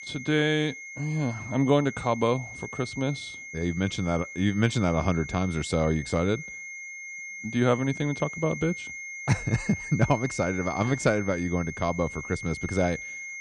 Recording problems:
high-pitched whine; loud; throughout; 2 kHz, 10 dB below the speech

